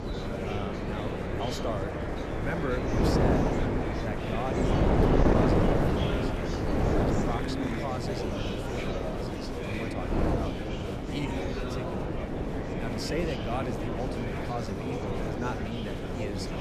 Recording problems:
murmuring crowd; very loud; throughout; as loud as the speech
wind noise on the microphone; heavy; 4 dB above the speech
rain or running water; noticeable; until 8.5 s; 15 dB below the speech

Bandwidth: 14.5 kHz